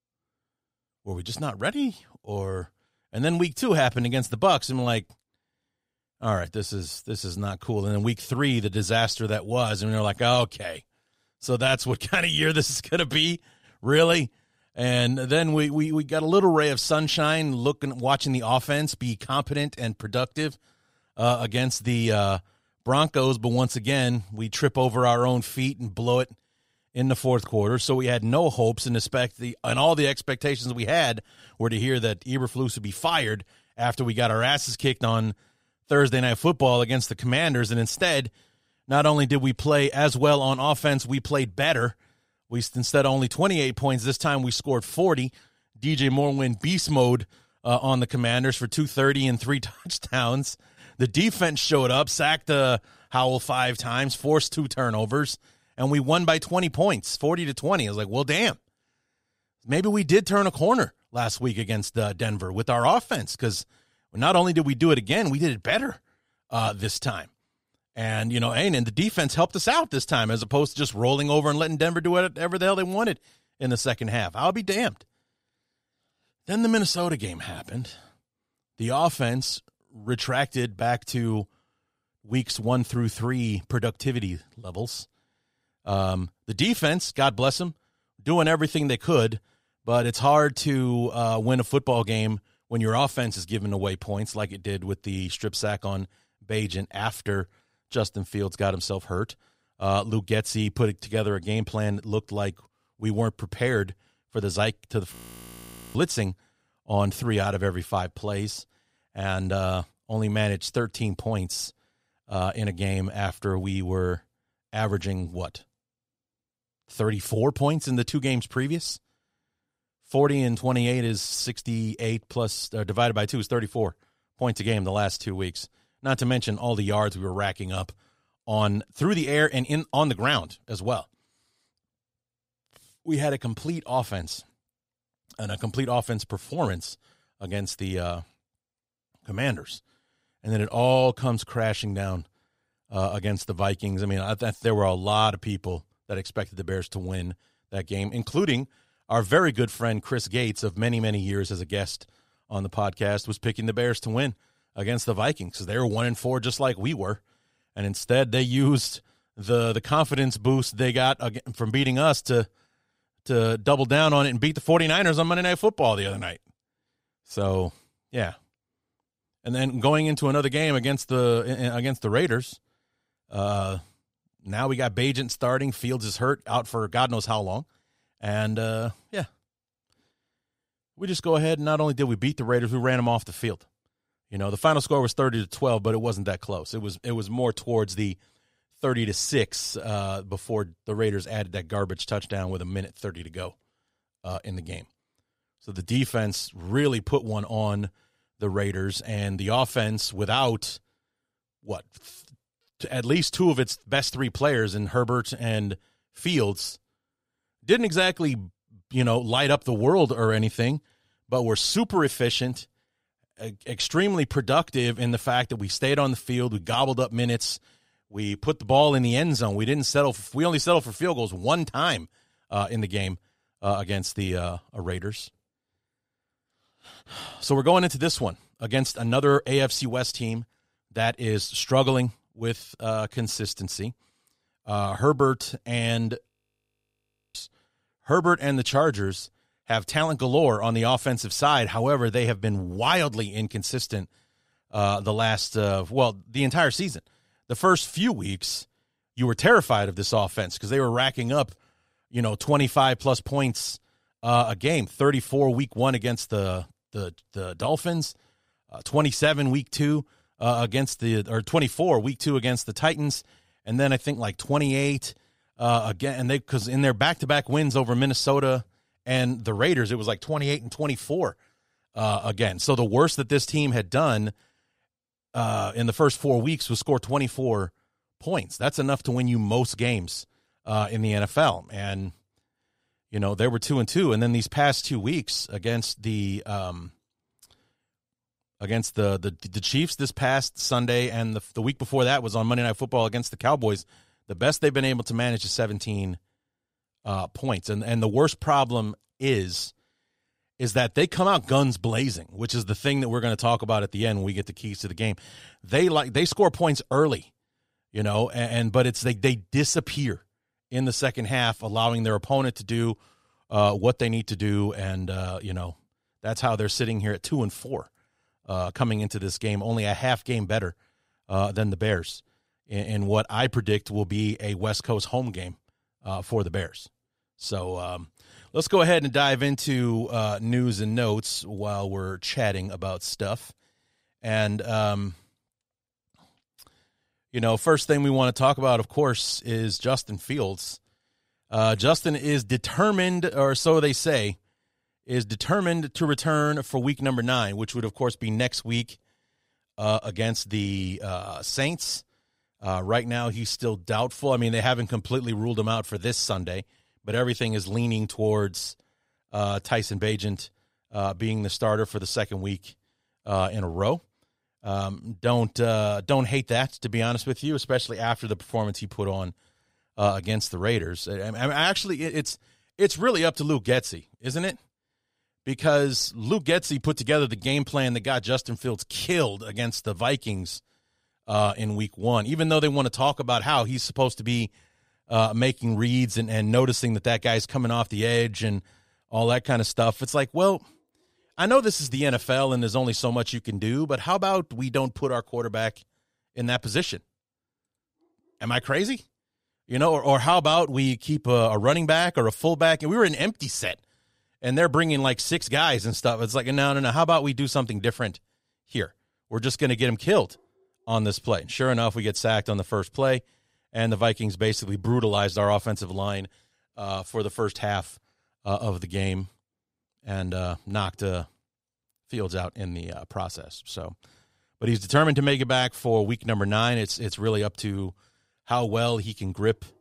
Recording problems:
audio freezing; at 1:45 for 1 s and at 3:56 for 1 s

